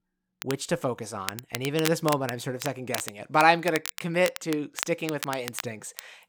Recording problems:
crackle, like an old record; loud; 9 dB below the speech

